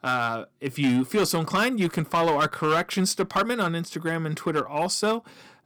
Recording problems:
distortion; slight; 6% of the sound clipped

